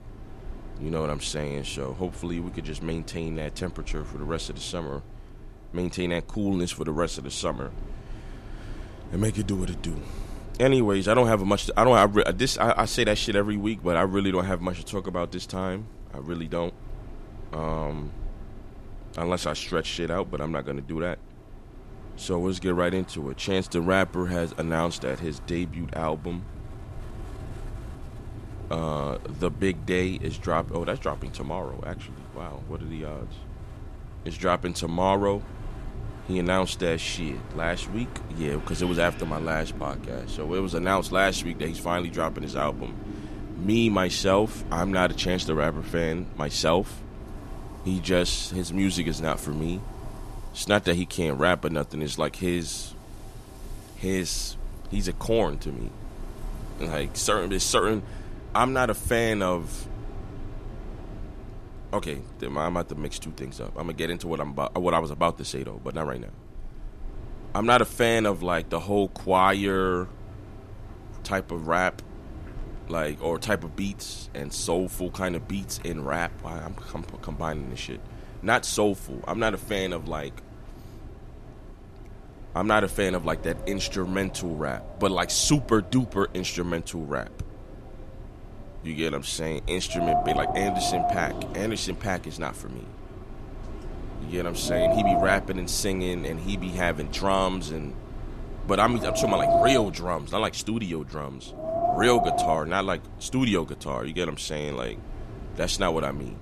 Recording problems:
wind in the background; loud; throughout; 10 dB below the speech

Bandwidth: 13.5 kHz